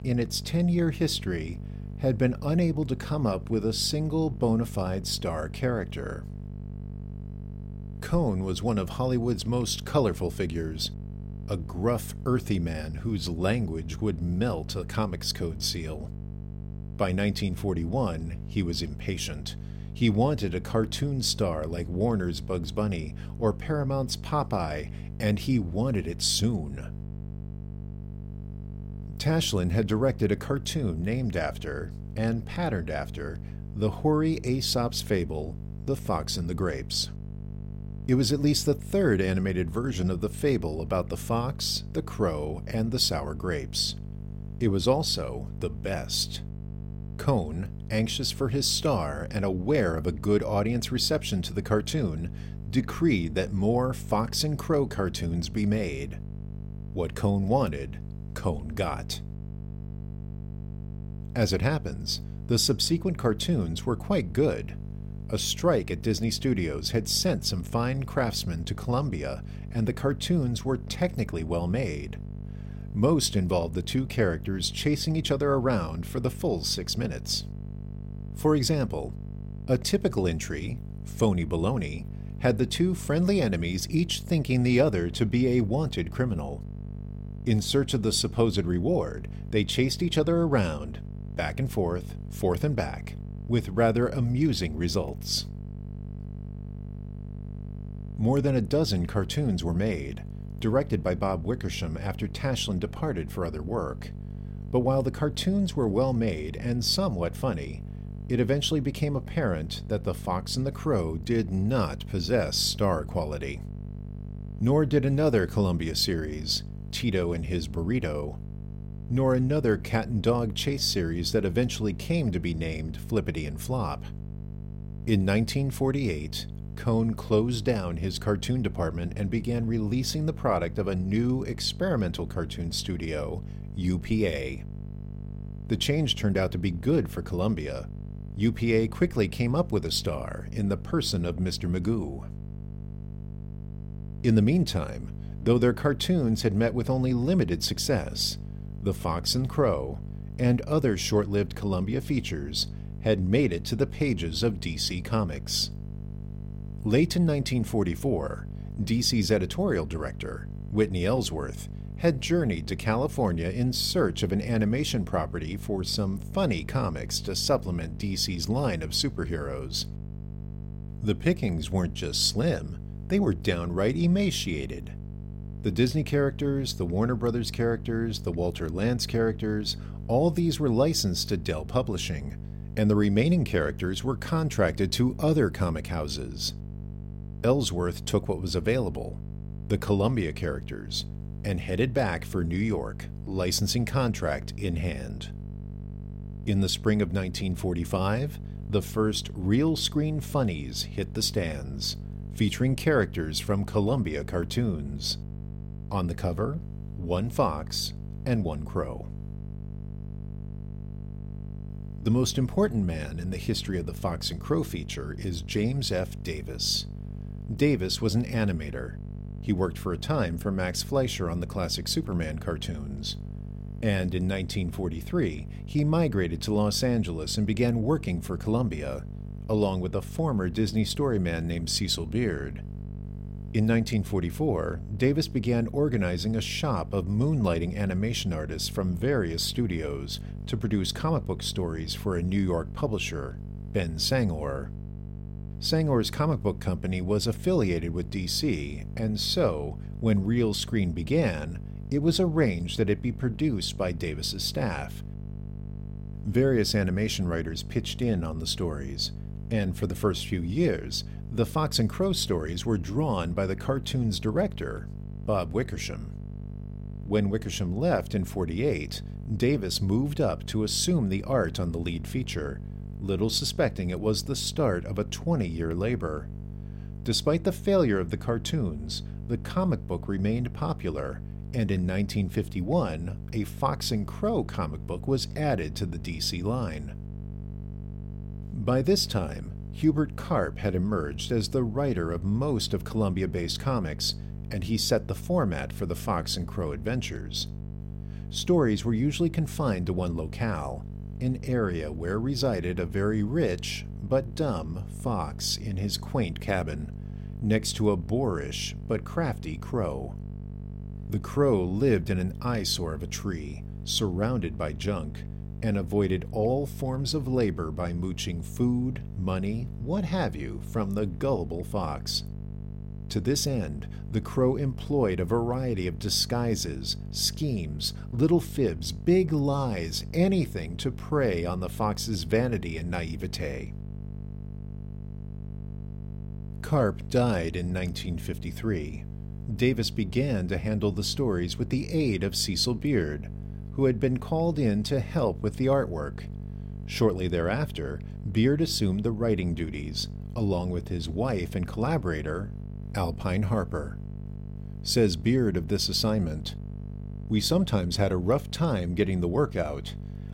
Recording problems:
electrical hum; noticeable; throughout; 50 Hz, 20 dB below the speech

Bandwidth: 16 kHz